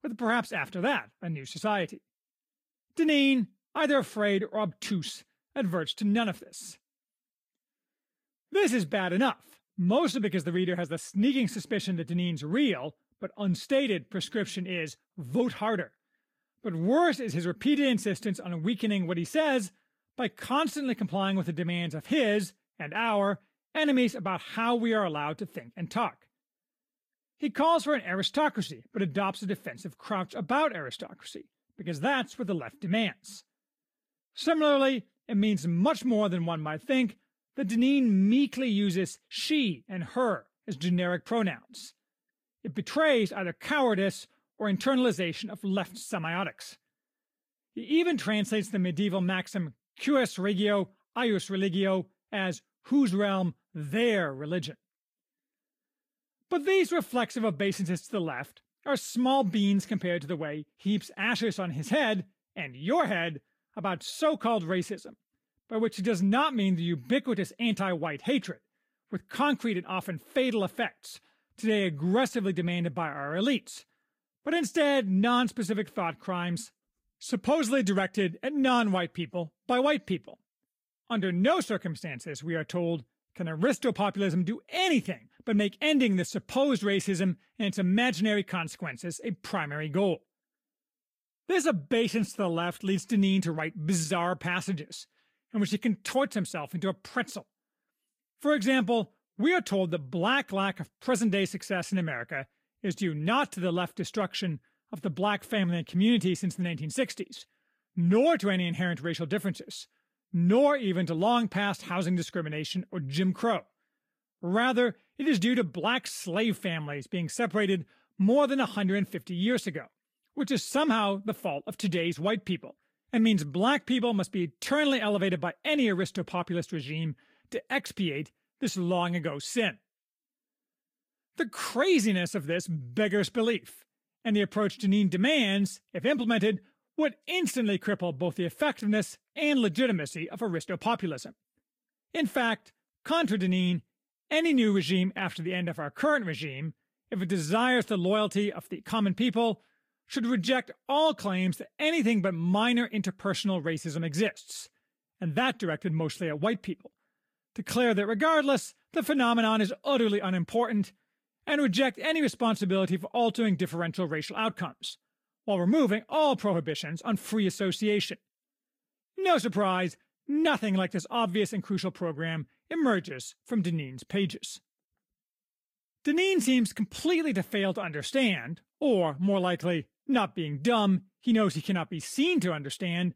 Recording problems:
garbled, watery; slightly; nothing above 15 kHz

